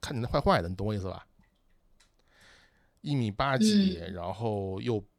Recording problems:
none

